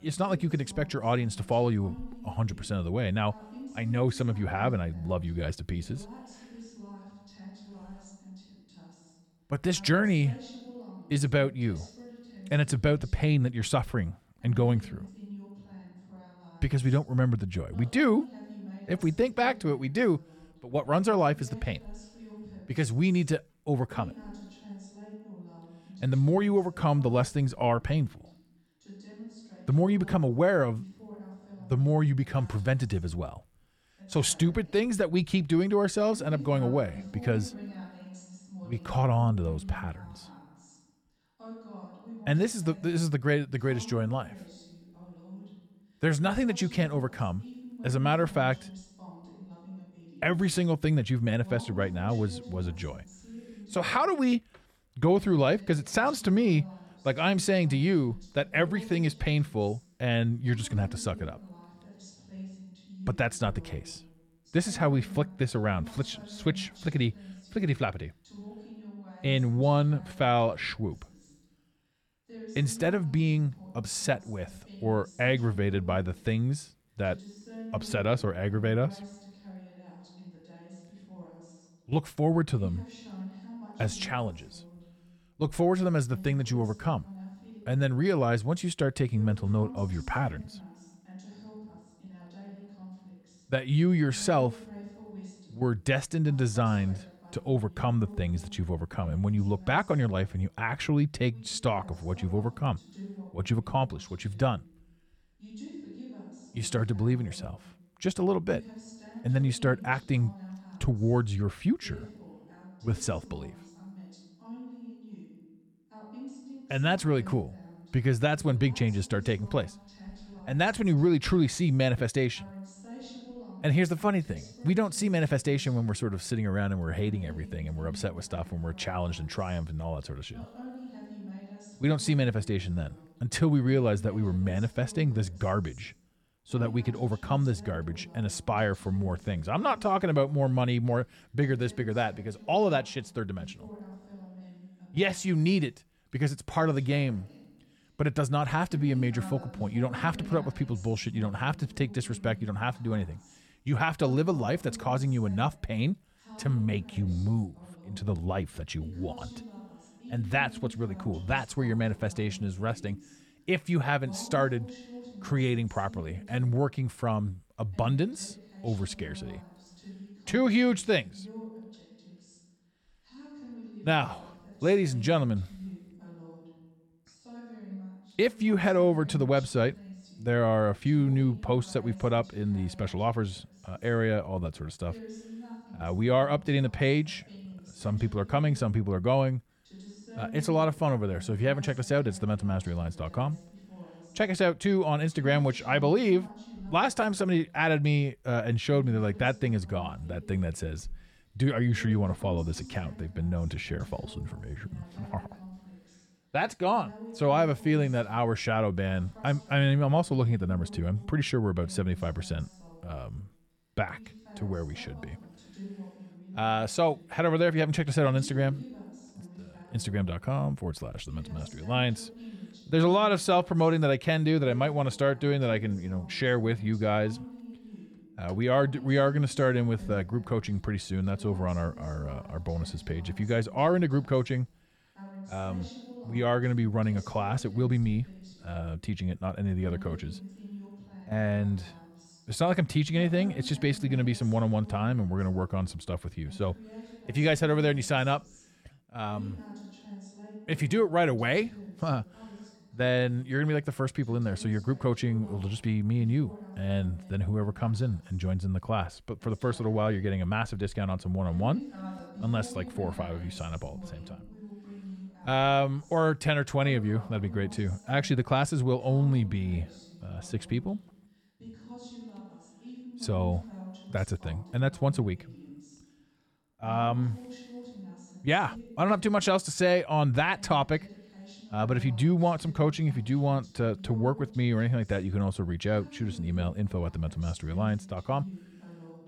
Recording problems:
voice in the background; noticeable; throughout; 20 dB below the speech

